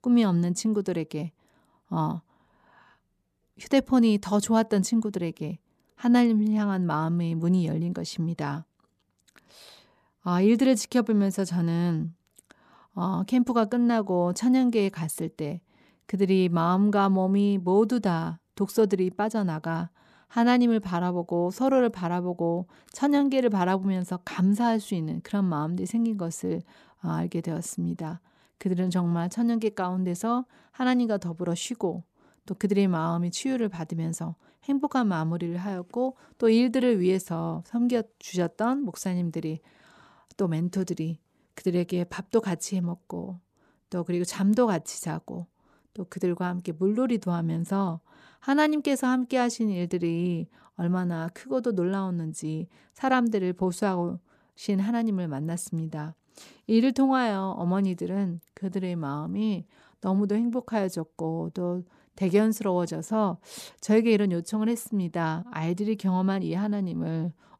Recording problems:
none

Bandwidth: 14 kHz